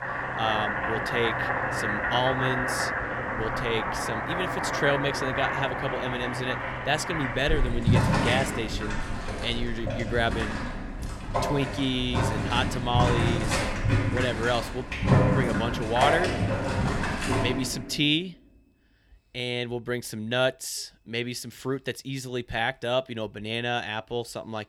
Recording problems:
household noises; very loud; until 18 s; 1 dB above the speech

